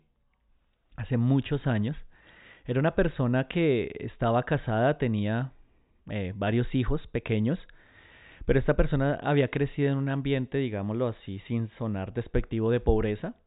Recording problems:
high frequencies cut off; severe; nothing above 4 kHz

